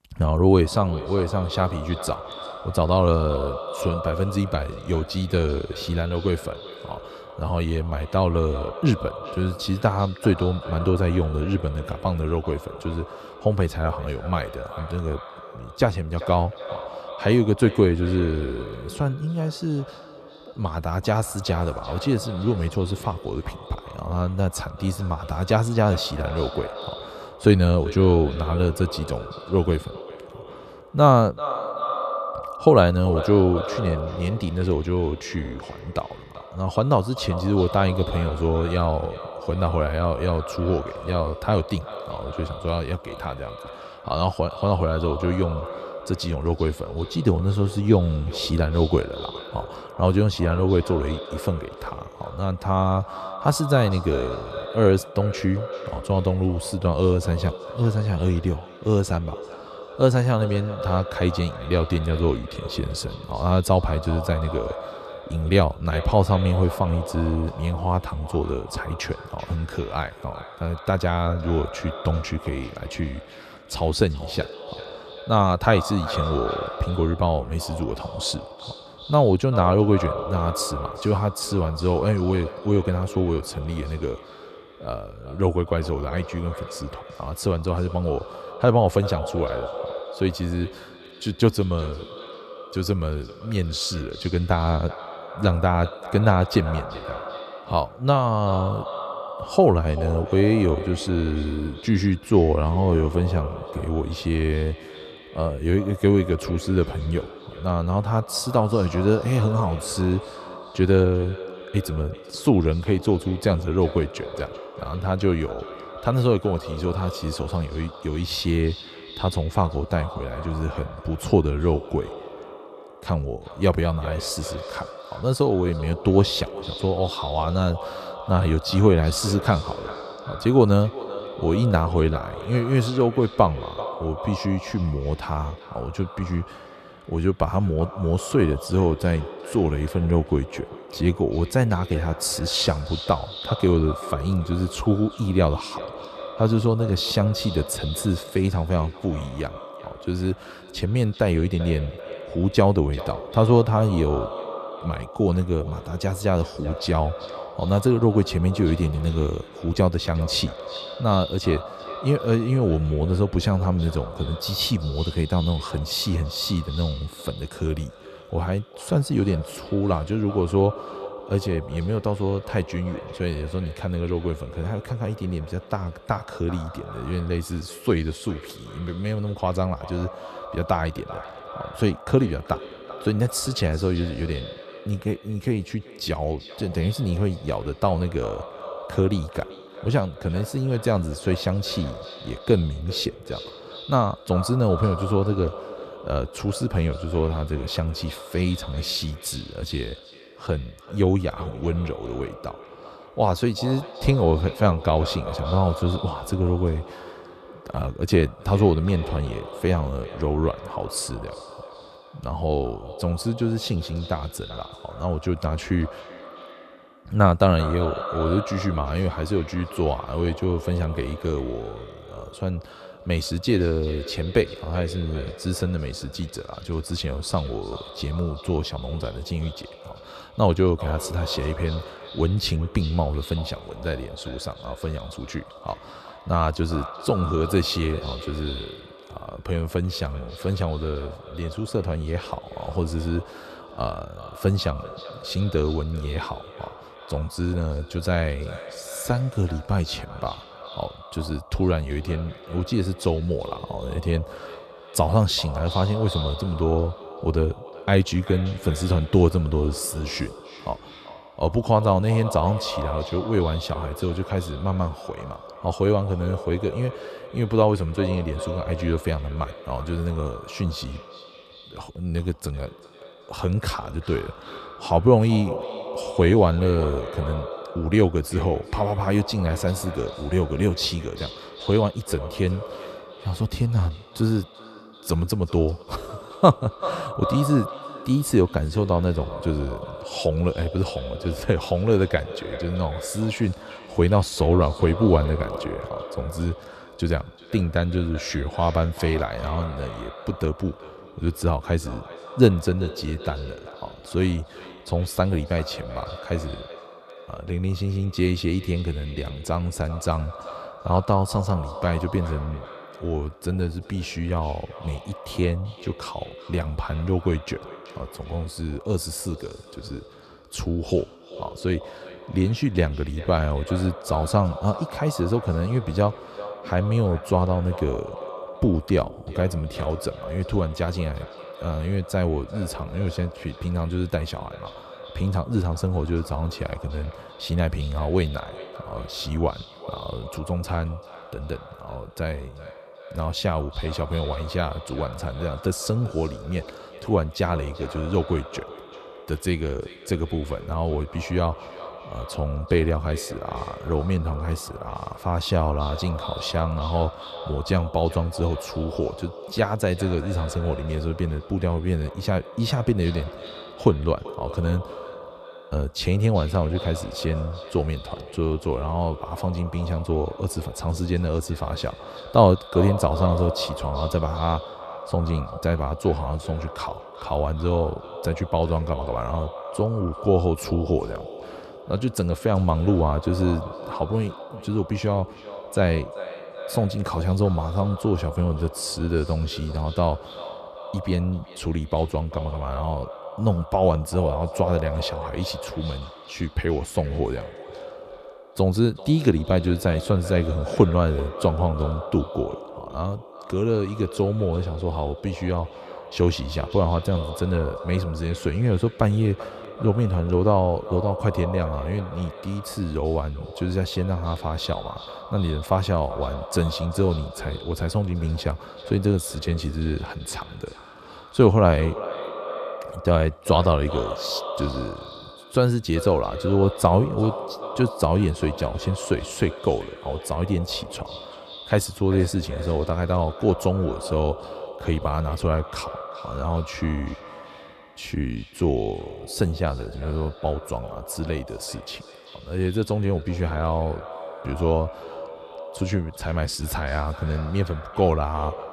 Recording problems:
echo of what is said; noticeable; throughout; 390 ms later, 15 dB below the speech

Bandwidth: 13.5 kHz